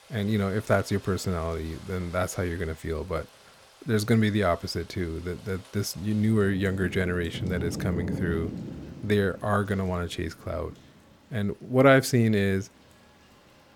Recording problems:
rain or running water; noticeable; throughout; 10 dB below the speech

